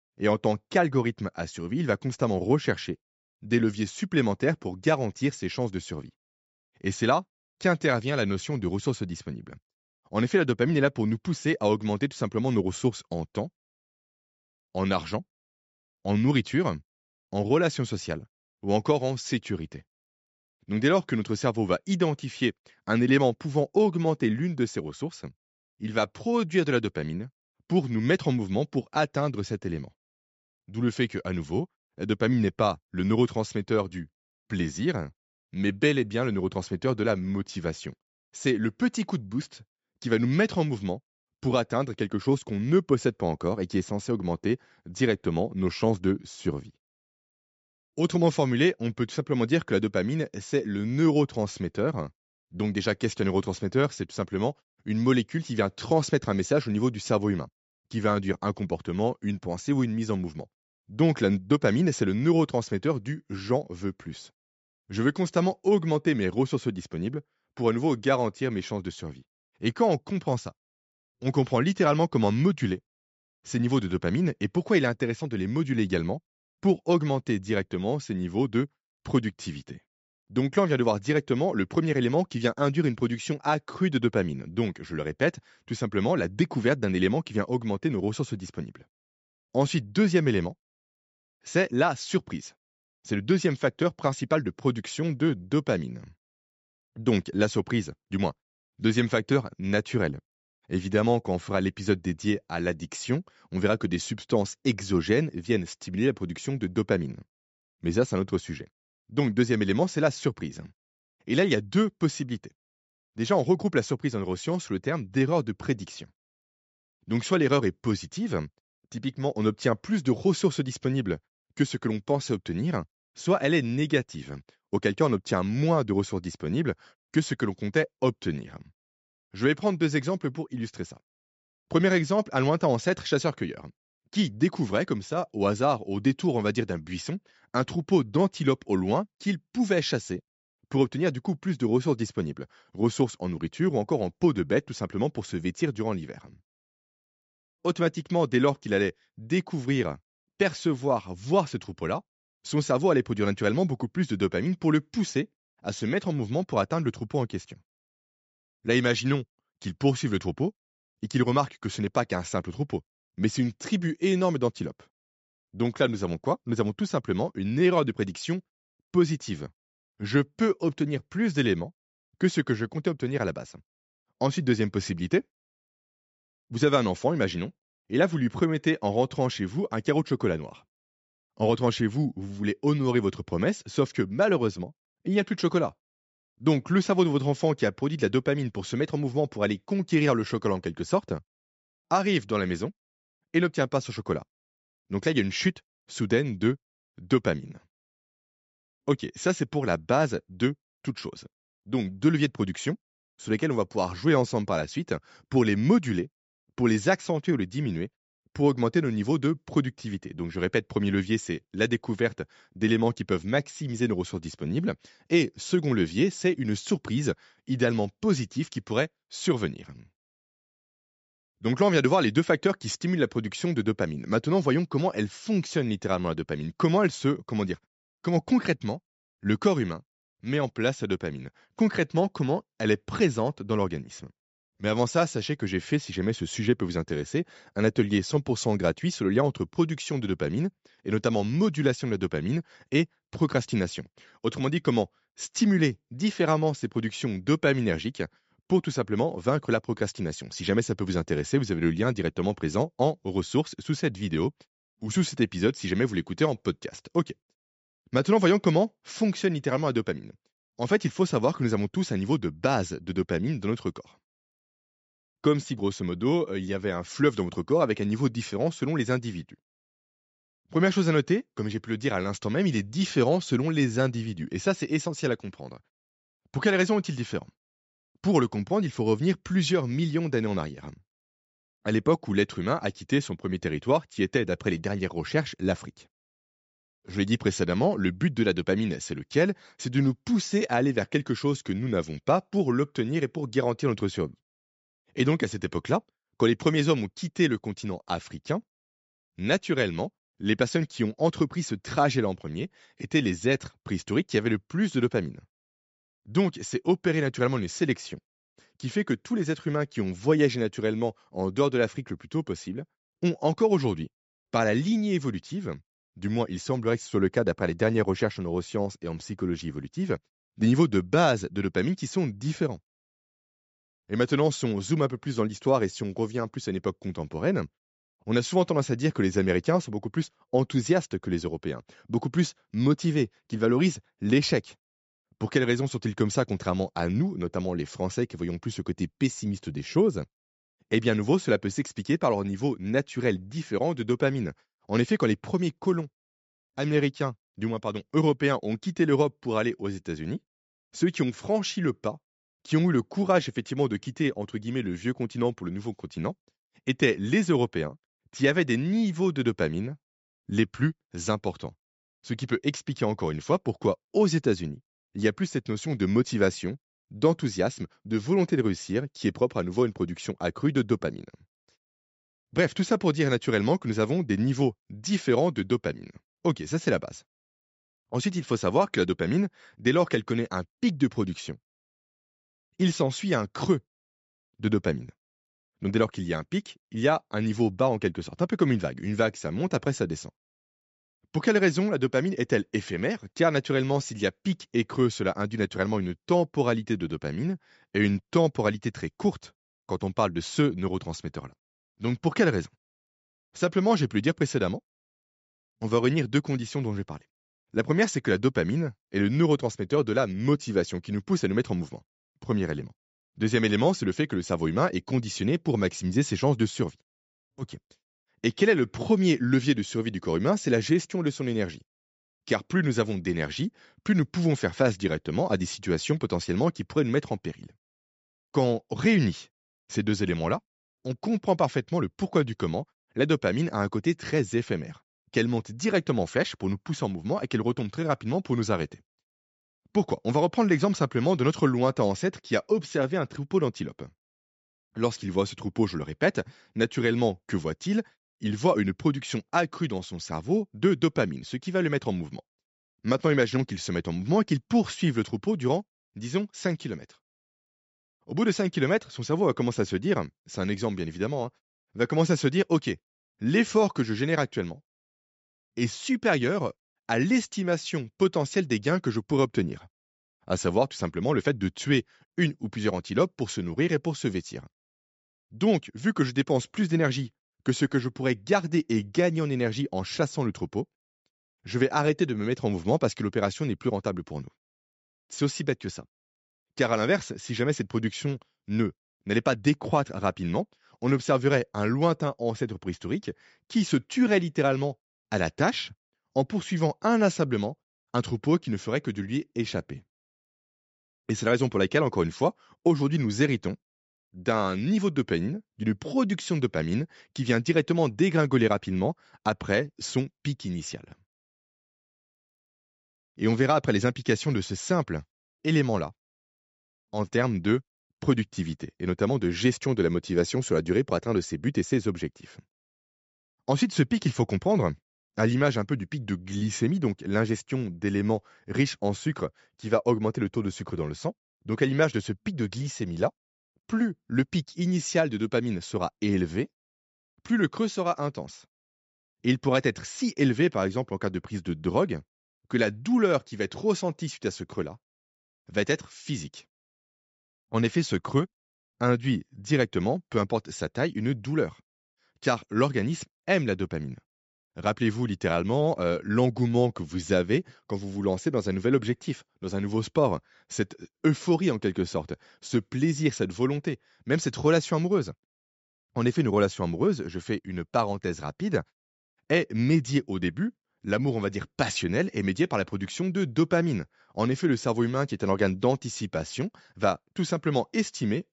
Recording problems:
high frequencies cut off; noticeable; nothing above 8 kHz

